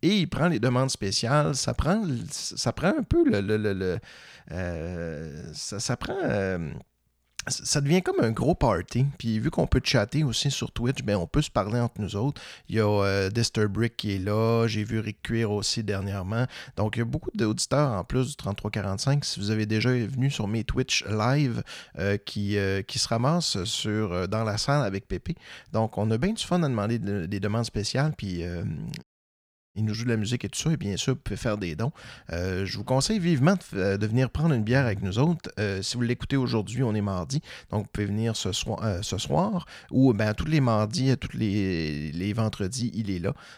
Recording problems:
audio cutting out; at 29 s for 0.5 s

